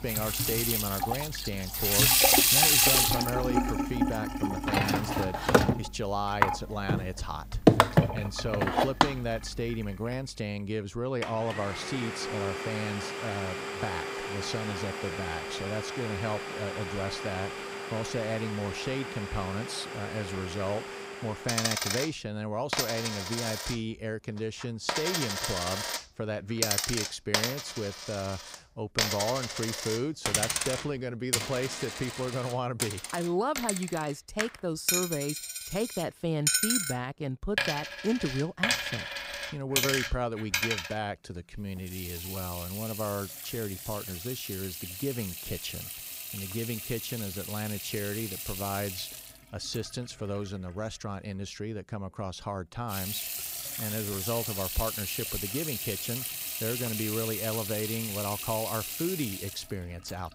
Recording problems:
household noises; very loud; throughout; 5 dB above the speech

